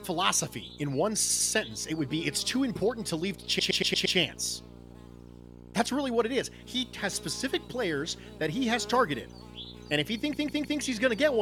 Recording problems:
electrical hum; noticeable; throughout; 60 Hz, 20 dB below the speech
audio stuttering; at 1 s, at 3.5 s and at 10 s
abrupt cut into speech; at the end

